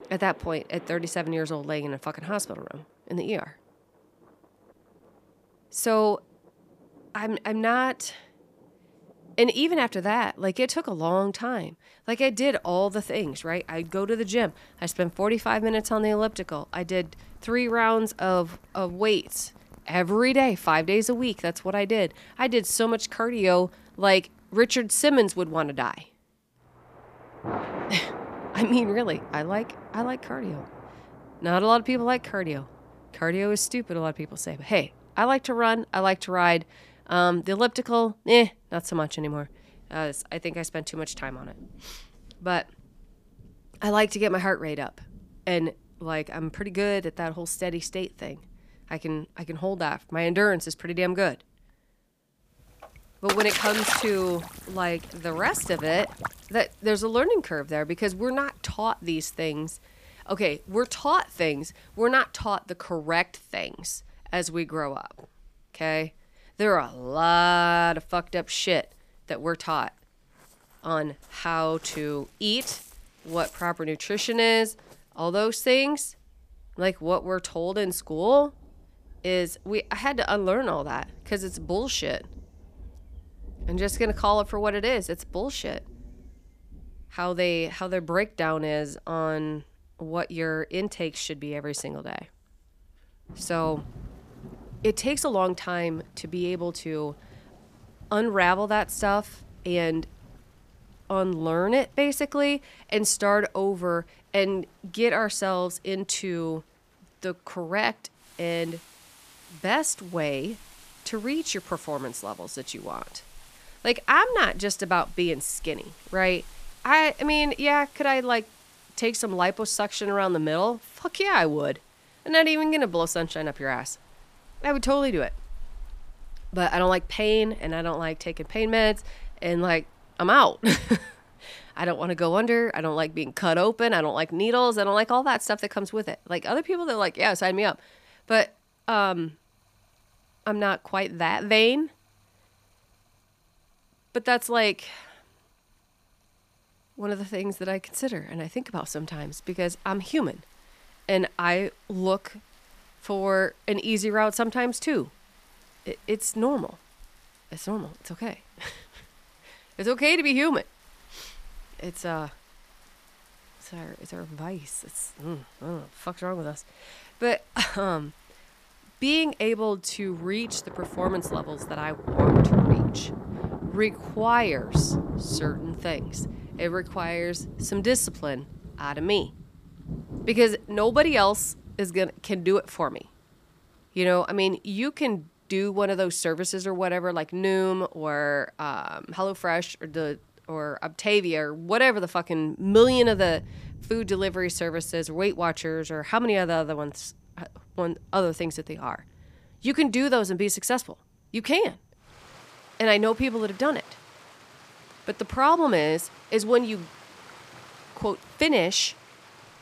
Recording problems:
rain or running water; loud; throughout; 10 dB below the speech

